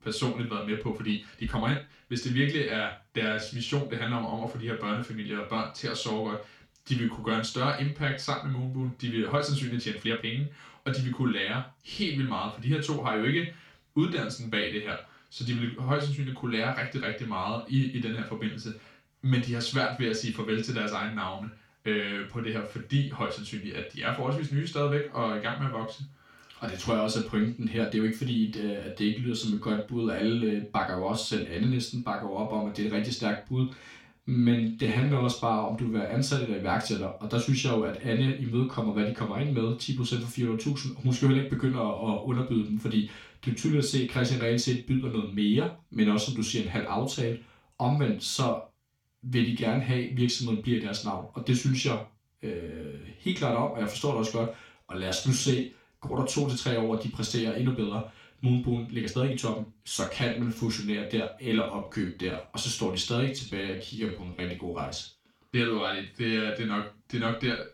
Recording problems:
off-mic speech; far
room echo; slight; dies away in 0.3 s
uneven, jittery; strongly; from 1 s to 1:05

